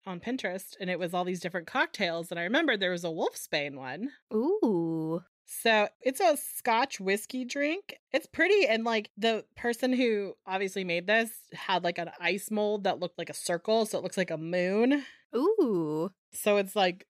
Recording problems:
none

